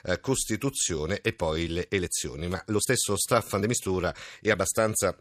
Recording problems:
uneven, jittery; strongly; from 0.5 to 4.5 s

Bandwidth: 14.5 kHz